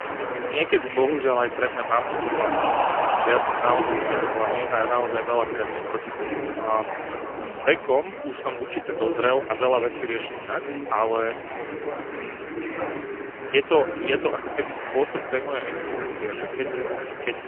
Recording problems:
phone-call audio; poor line; nothing above 3 kHz
chatter from many people; loud; throughout; 4 dB below the speech

